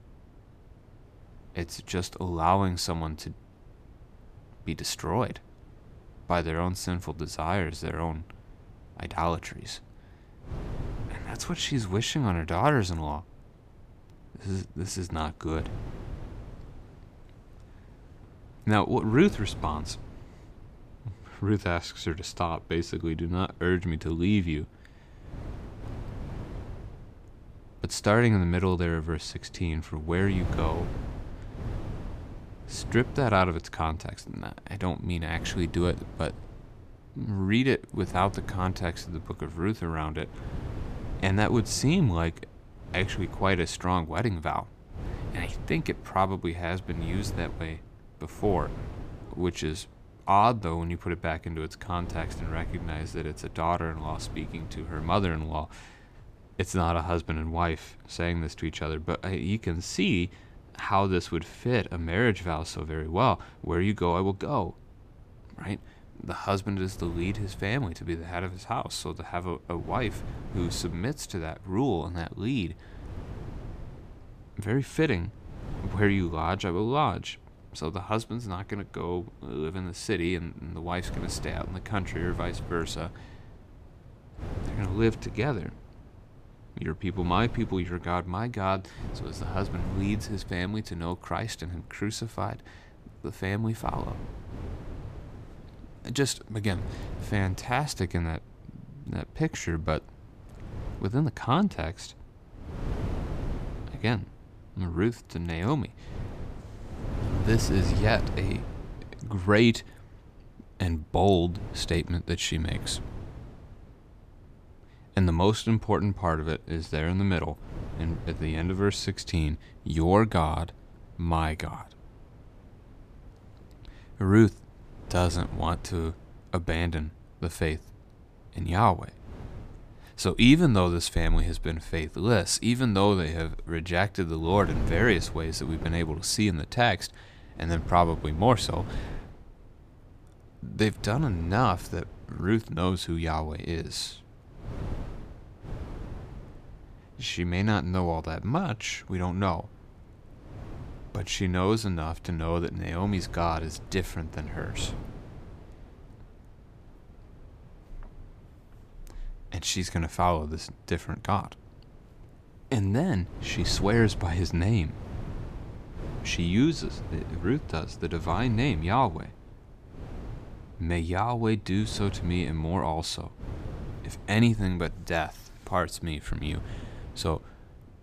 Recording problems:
wind noise on the microphone; occasional gusts; 20 dB below the speech

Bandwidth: 14.5 kHz